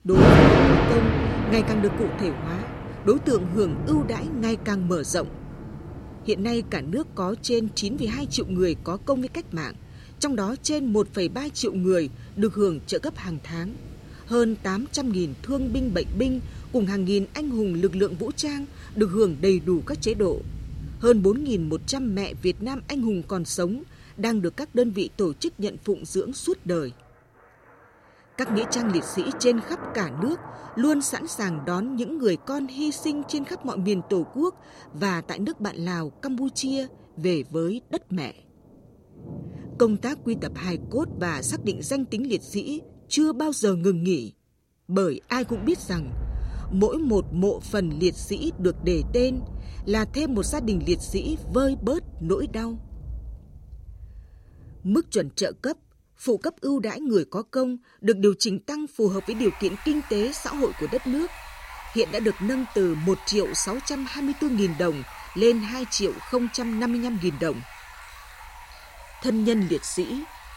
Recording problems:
rain or running water; loud; throughout; 5 dB below the speech

